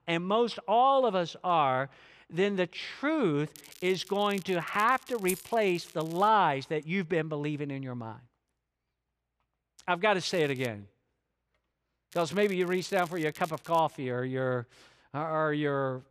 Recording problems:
crackling; faint; from 3.5 to 6.5 s, at 10 s and from 12 to 14 s; 20 dB below the speech
jangling keys; noticeable; at 5.5 s; peak 9 dB below the speech

